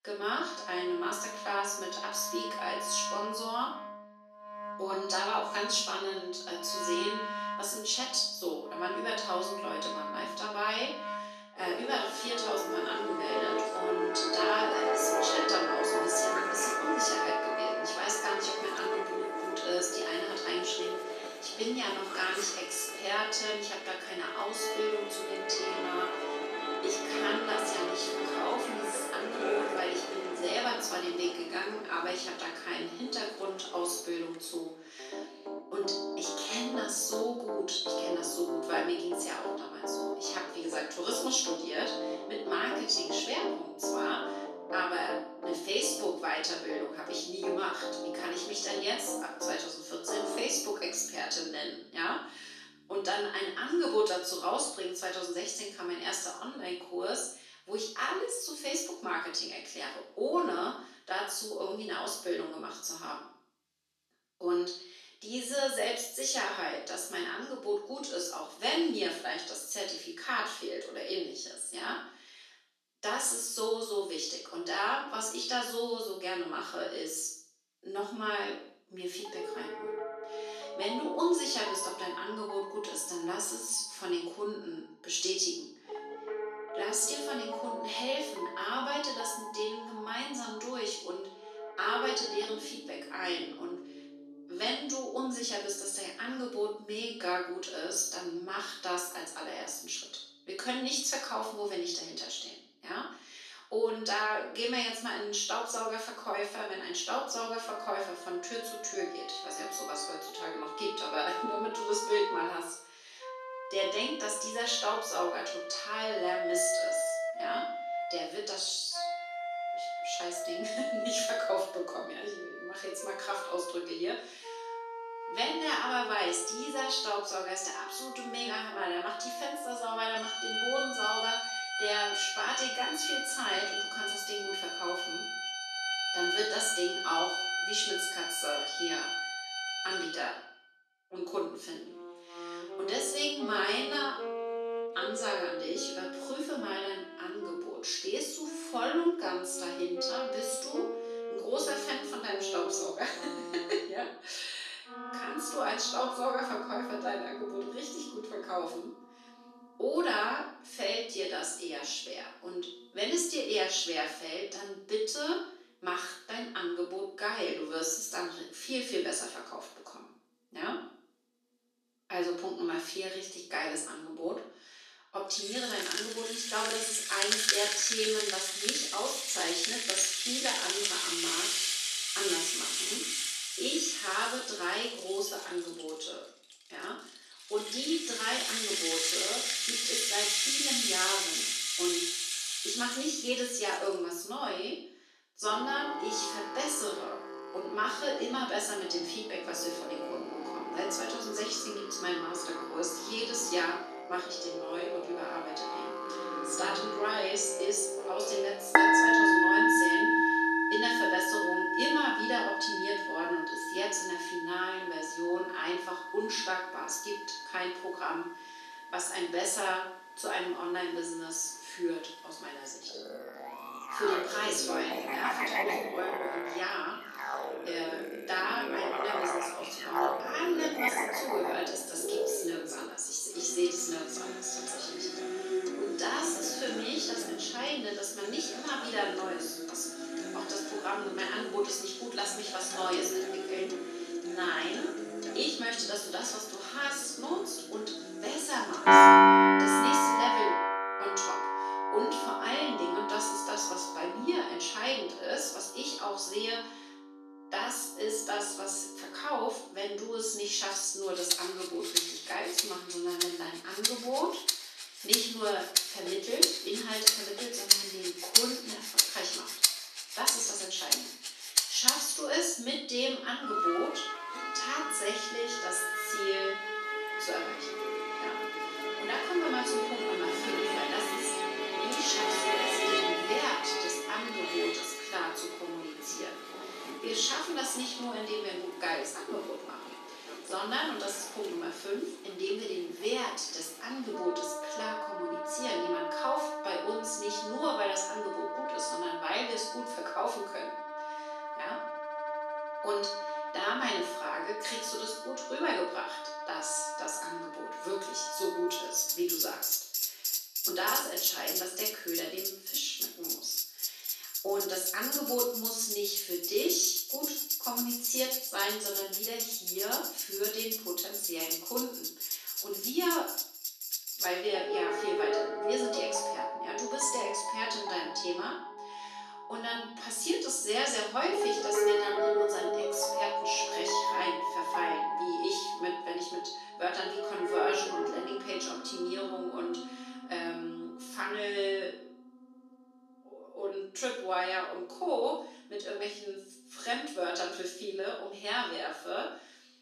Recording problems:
off-mic speech; far
room echo; noticeable; dies away in 0.5 s
thin; somewhat; fading below 300 Hz
background music; very loud; throughout; 1 dB above the speech

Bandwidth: 13.5 kHz